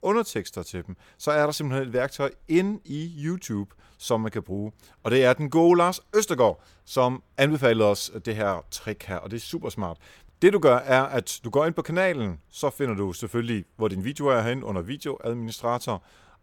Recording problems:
none

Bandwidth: 17 kHz